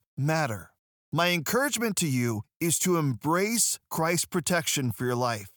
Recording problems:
none

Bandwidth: 18.5 kHz